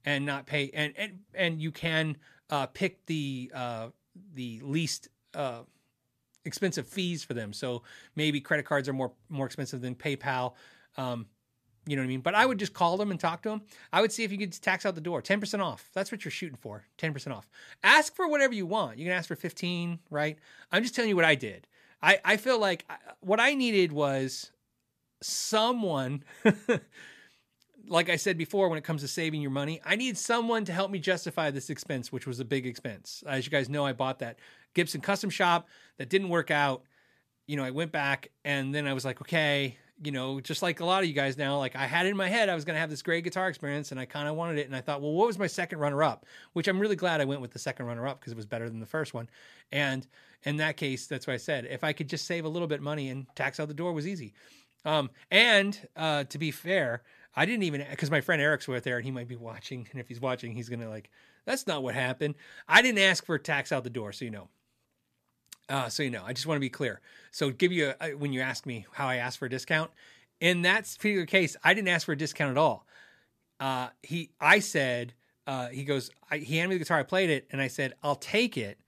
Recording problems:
none

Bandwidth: 14.5 kHz